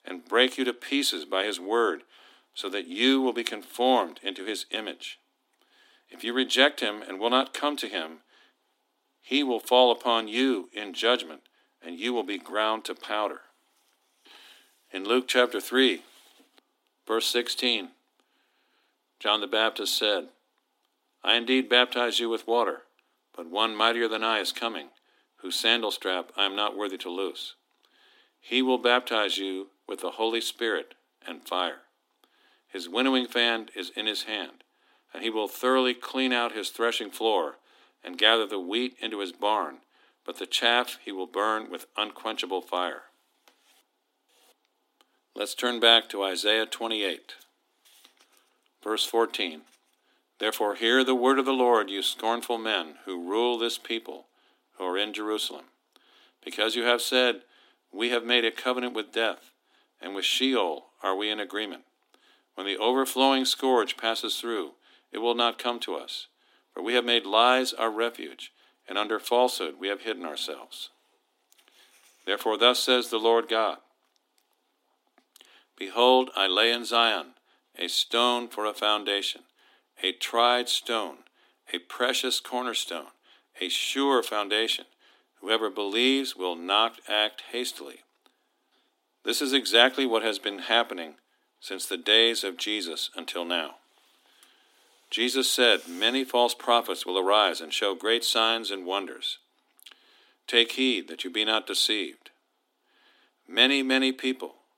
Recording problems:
thin; very slightly; fading below 250 Hz

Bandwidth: 16 kHz